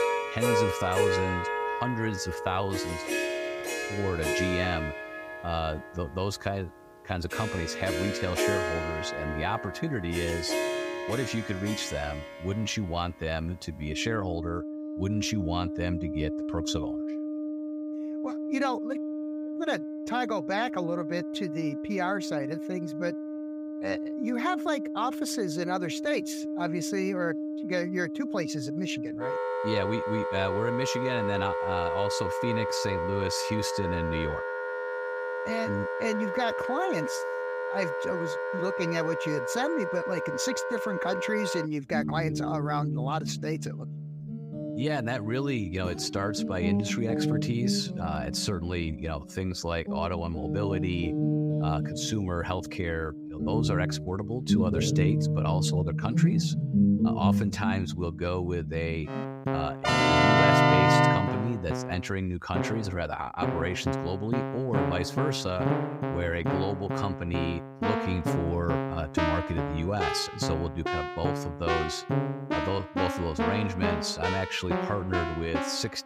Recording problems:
background music; very loud; throughout; 1 dB above the speech

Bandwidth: 15.5 kHz